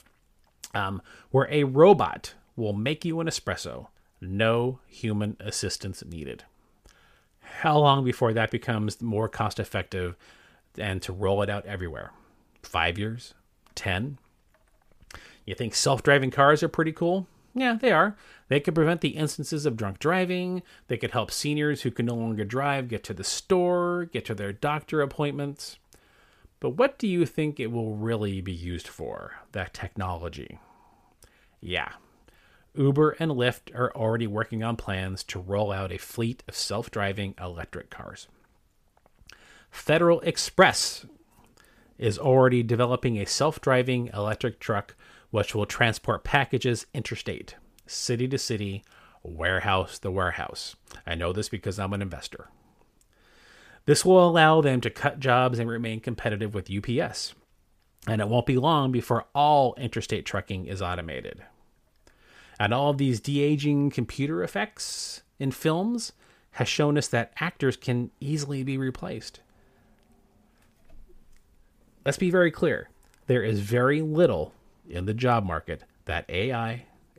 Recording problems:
none

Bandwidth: 15 kHz